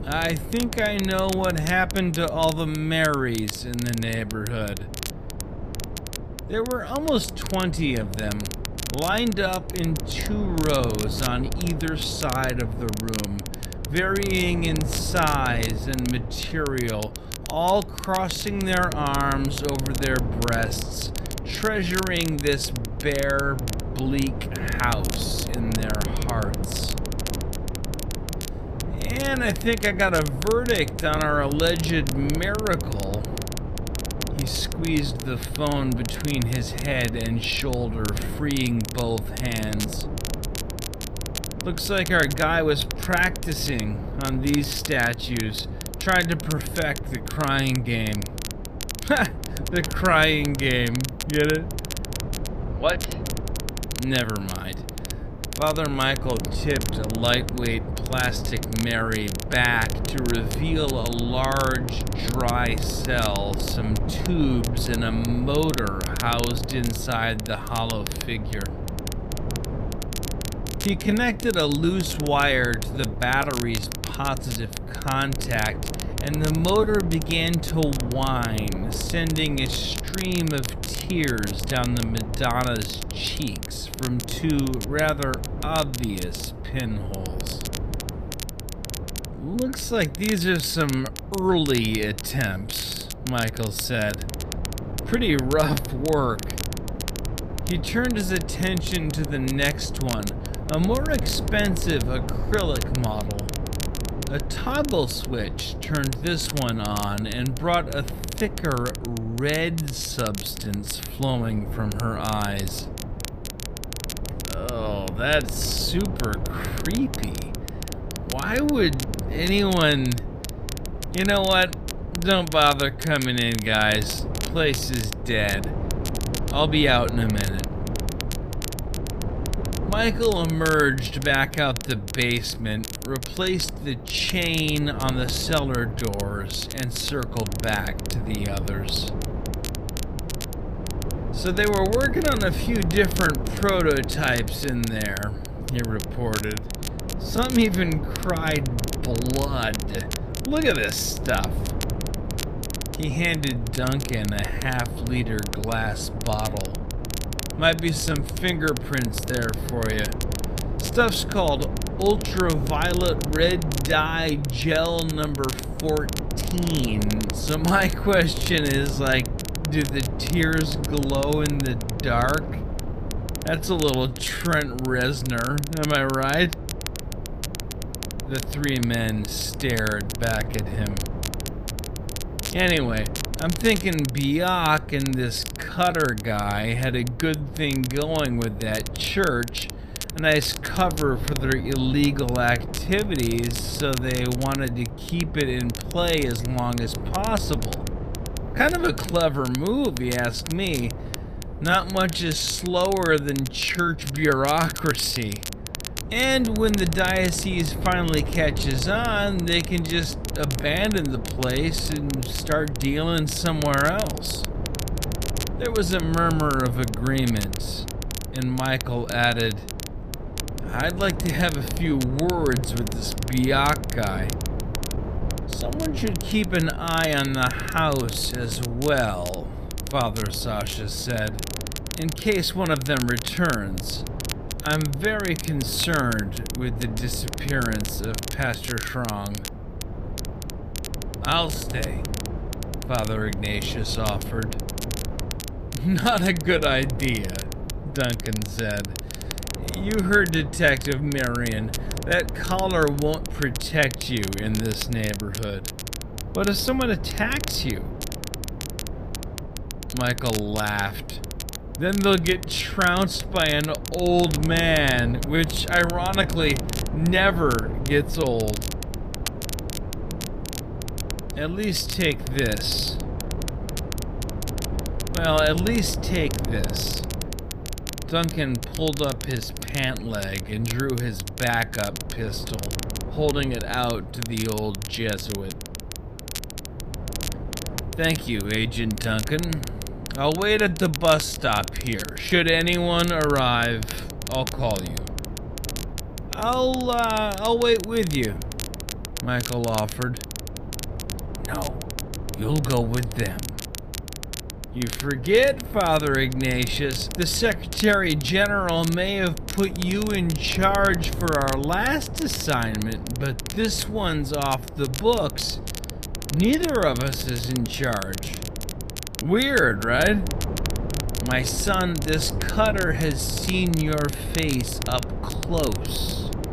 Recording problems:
wrong speed, natural pitch; too slow; 0.6 times normal speed
wind noise on the microphone; occasional gusts; 15 dB below the speech
crackle, like an old record; noticeable; 10 dB below the speech

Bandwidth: 14.5 kHz